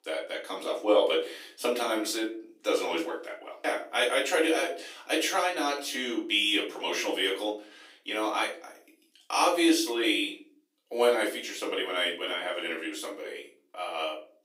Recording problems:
off-mic speech; far
thin; very; fading below 300 Hz
room echo; slight; dies away in 0.4 s

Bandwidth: 15.5 kHz